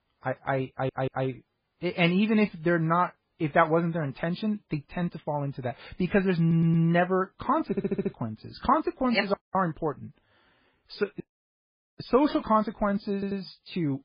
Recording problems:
garbled, watery; badly; nothing above 5 kHz
audio stuttering; 4 times, first at 0.5 s
audio cutting out; at 9.5 s and at 11 s for 1 s

